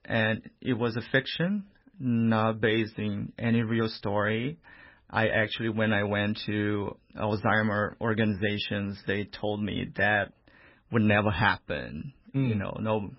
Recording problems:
garbled, watery; badly; nothing above 5.5 kHz

